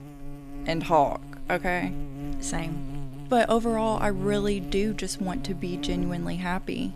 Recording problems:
electrical hum; noticeable; throughout; 50 Hz, 15 dB below the speech

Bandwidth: 14.5 kHz